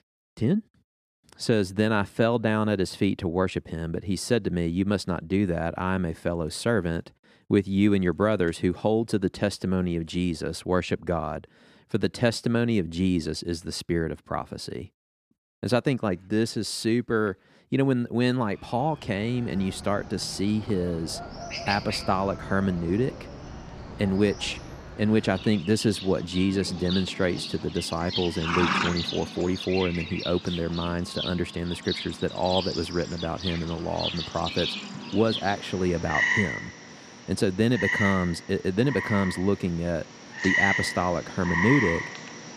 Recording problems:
animal sounds; loud; from 19 s on; 4 dB below the speech

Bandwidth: 14.5 kHz